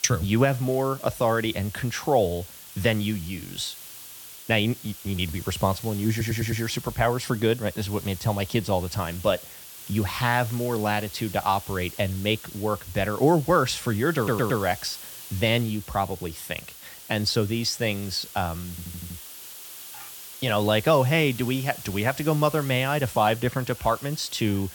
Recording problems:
hiss; noticeable; throughout; 15 dB below the speech
audio stuttering; at 6 s, at 14 s and at 19 s

